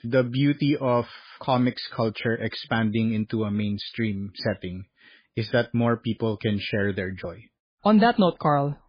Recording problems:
garbled, watery; badly

